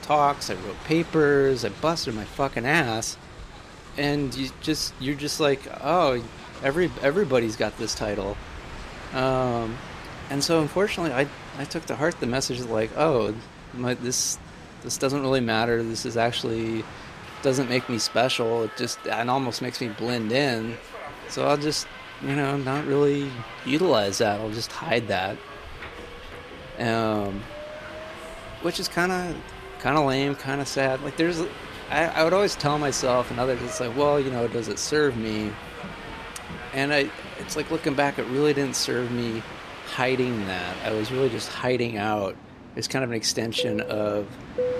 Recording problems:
train or aircraft noise; noticeable; throughout; 15 dB below the speech

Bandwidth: 14.5 kHz